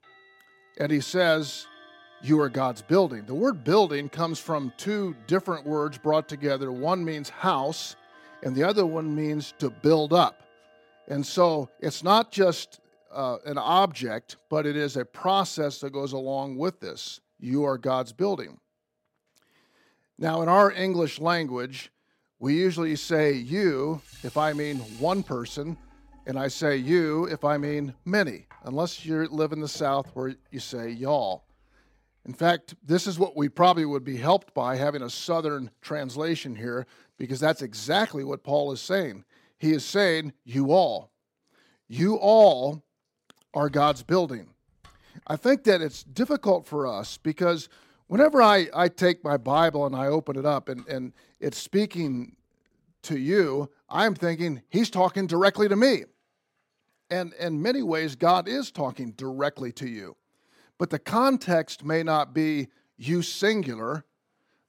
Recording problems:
household noises; faint; throughout; 30 dB below the speech

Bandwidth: 16 kHz